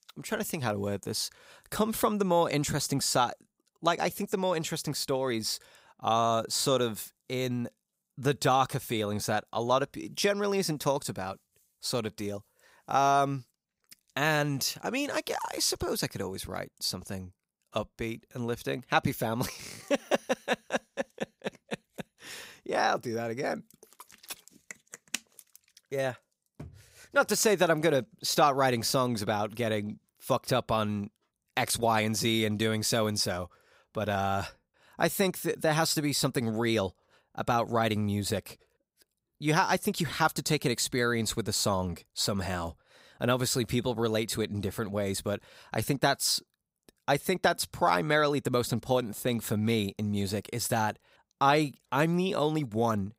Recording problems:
none

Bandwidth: 15.5 kHz